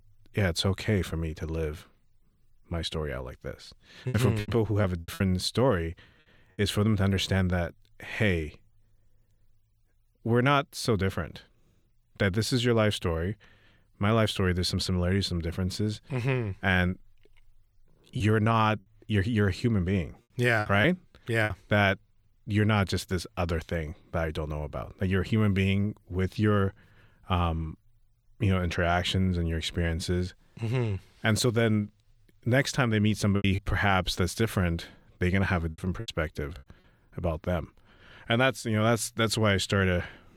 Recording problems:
choppy; very; from 4 to 5 s, from 18 to 22 s and from 33 to 36 s; 9% of the speech affected

